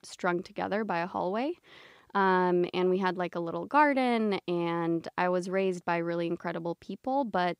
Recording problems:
none

